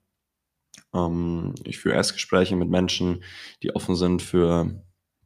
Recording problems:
none

